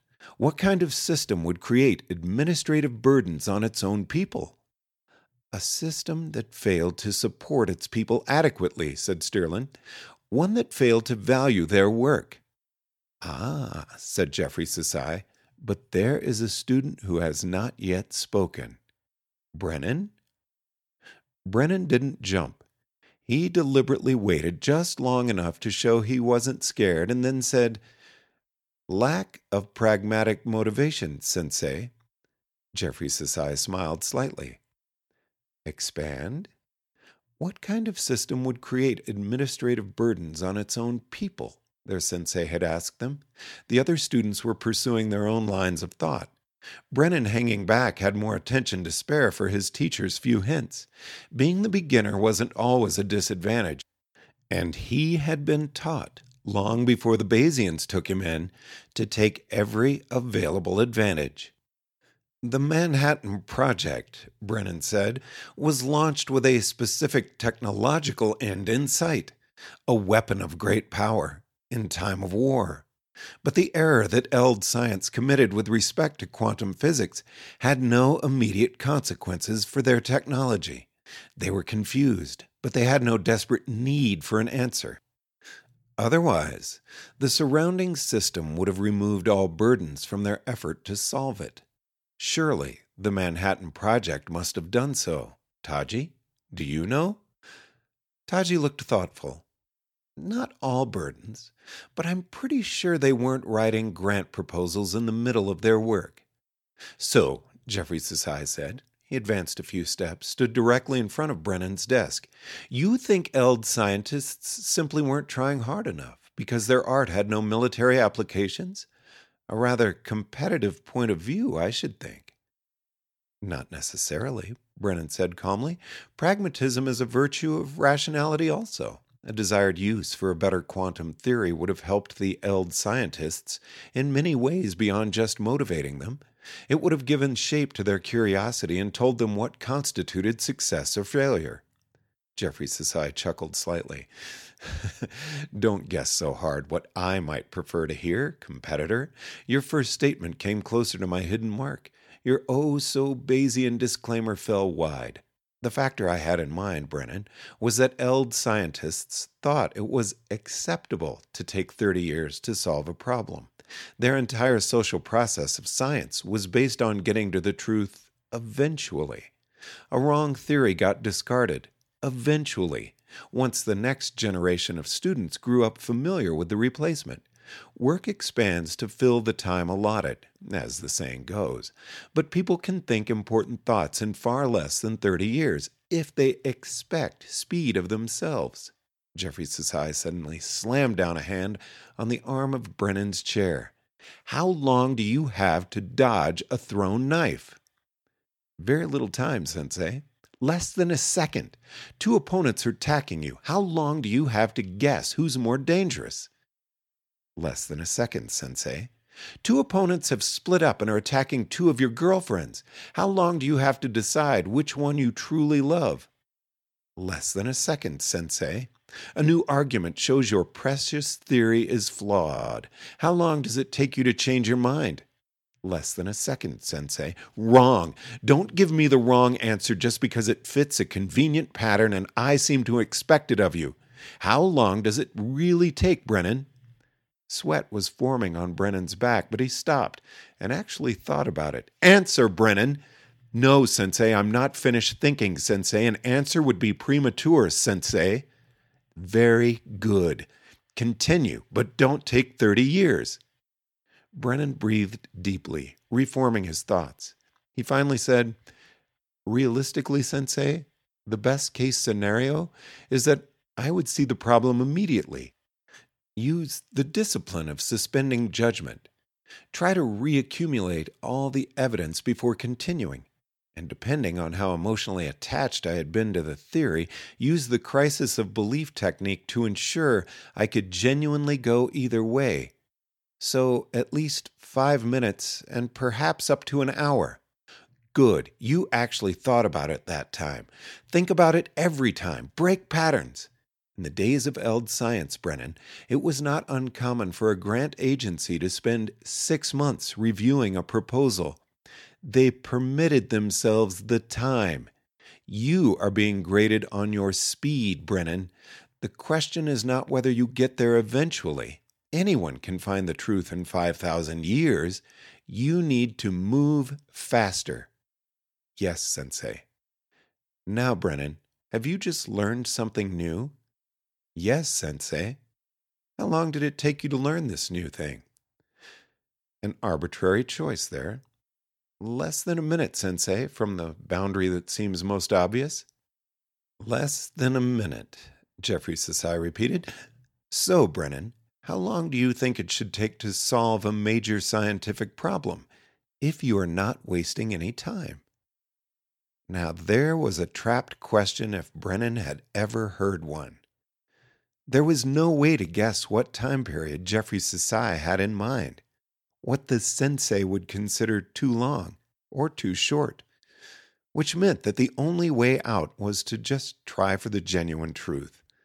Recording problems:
audio stuttering; at 3:42

